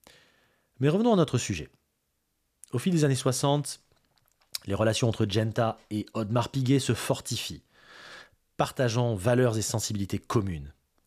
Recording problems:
none

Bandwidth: 14.5 kHz